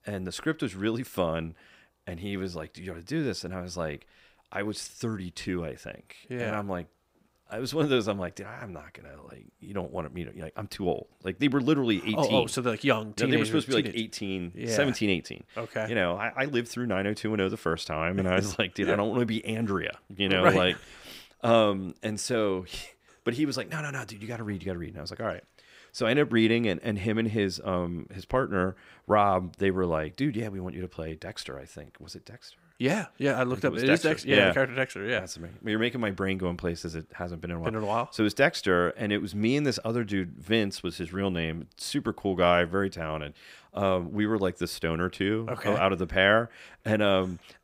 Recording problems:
none

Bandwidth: 15.5 kHz